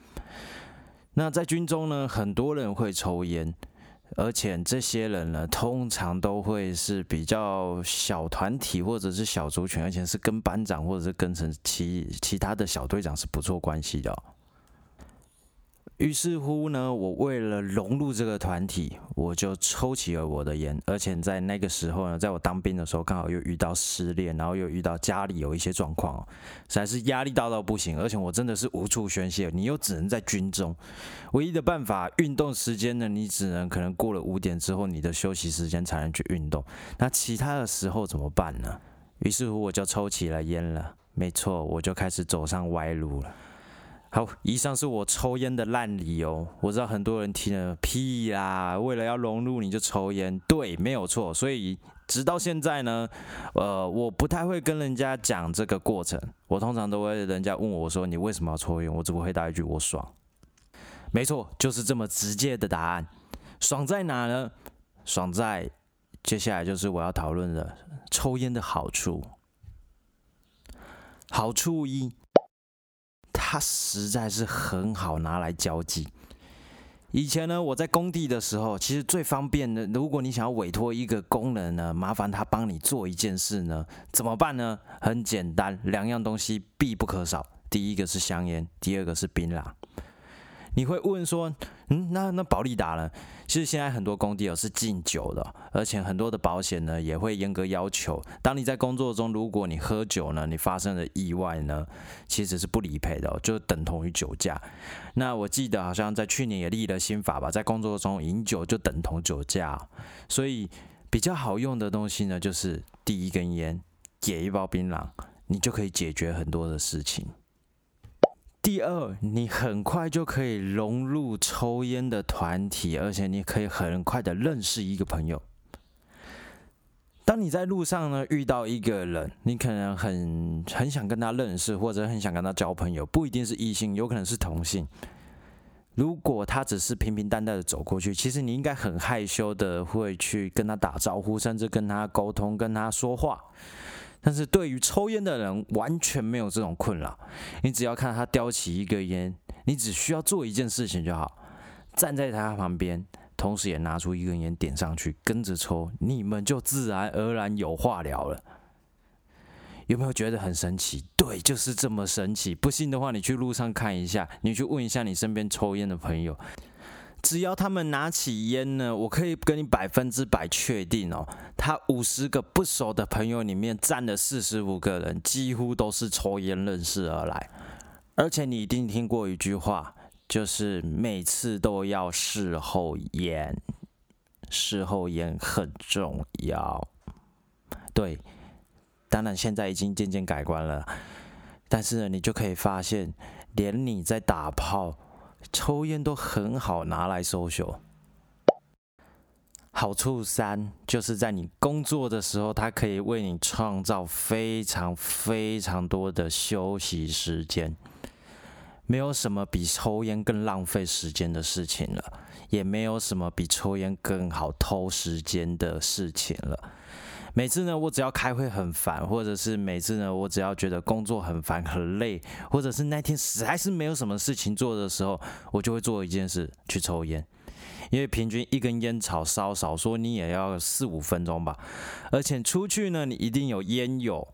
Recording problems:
squashed, flat; heavily

